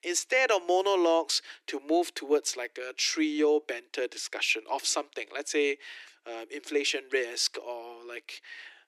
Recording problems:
thin; very; fading below 300 Hz

